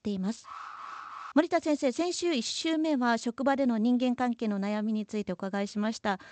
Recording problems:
garbled, watery; slightly; nothing above 8 kHz
alarm; faint; at 0.5 s; peak 10 dB below the speech

